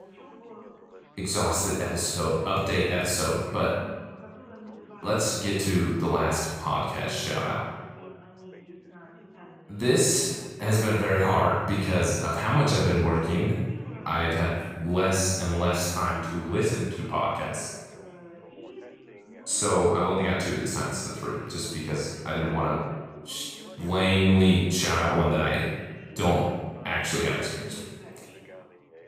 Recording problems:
room echo; strong; dies away in 1 s
off-mic speech; far
background chatter; faint; throughout; 4 voices, 20 dB below the speech

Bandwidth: 15.5 kHz